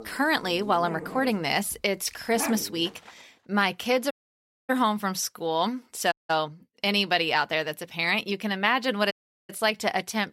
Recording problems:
animal sounds; noticeable; until 3 s; 10 dB below the speech
audio cutting out; at 4 s for 0.5 s, at 6 s and at 9 s

